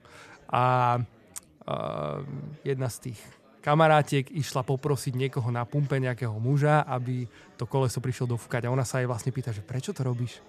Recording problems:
chatter from many people; faint; throughout; 30 dB below the speech

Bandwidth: 14 kHz